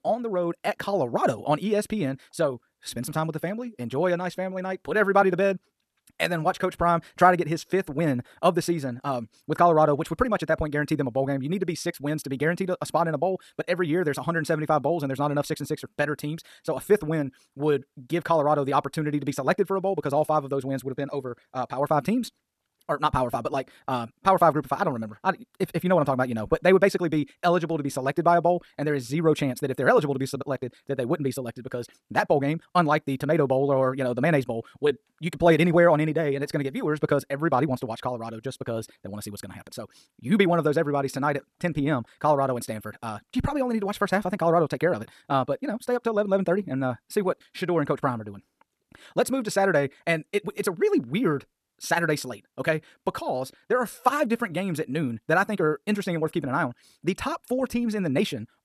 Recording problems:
wrong speed, natural pitch; too fast; 1.6 times normal speed

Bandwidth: 13.5 kHz